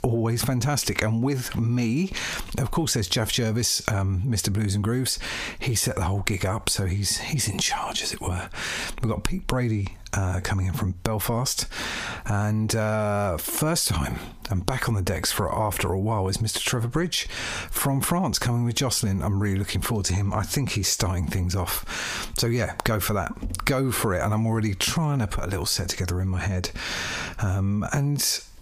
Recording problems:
squashed, flat; heavily

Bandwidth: 15 kHz